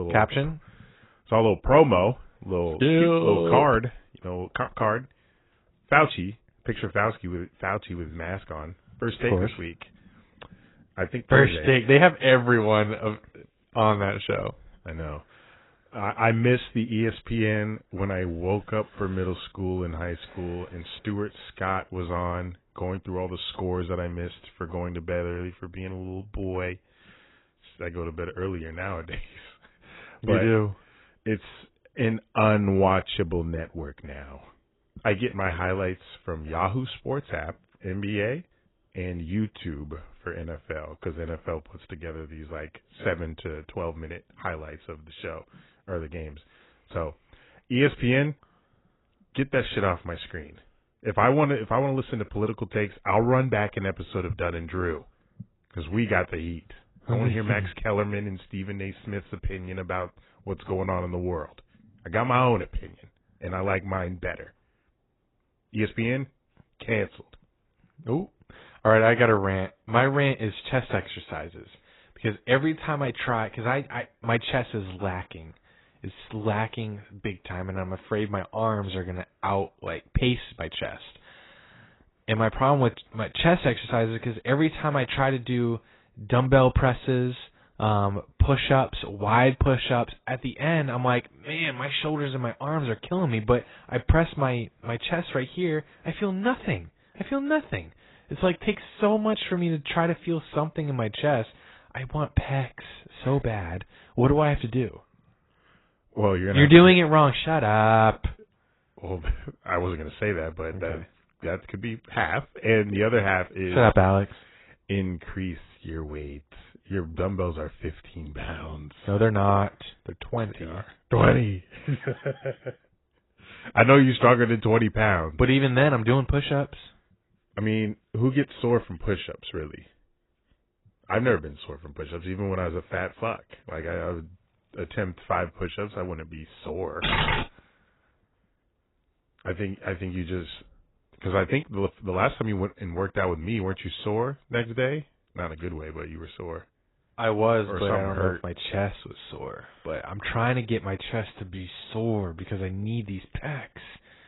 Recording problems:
garbled, watery; badly; nothing above 4 kHz
abrupt cut into speech; at the start
keyboard typing; loud; at 2:17; peak 2 dB above the speech

